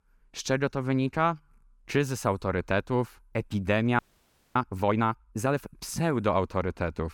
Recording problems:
audio freezing; at 4 s for 0.5 s

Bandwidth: 18 kHz